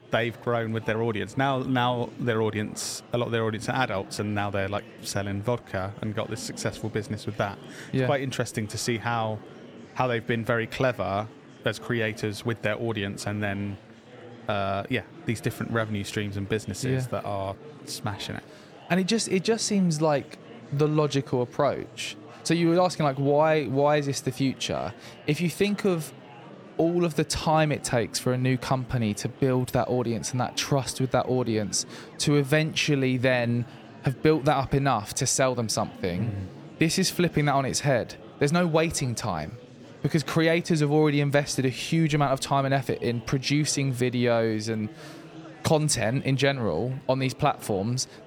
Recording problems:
murmuring crowd; noticeable; throughout; 20 dB below the speech

